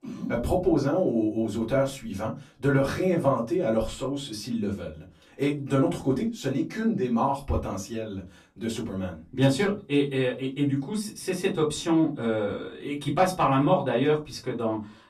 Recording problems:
off-mic speech; far
room echo; very slight; dies away in 0.2 s

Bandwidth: 14 kHz